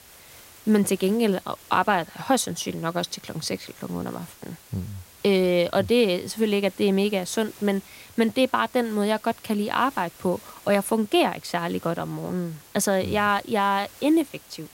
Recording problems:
hiss; faint; throughout; 20 dB below the speech

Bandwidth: 16 kHz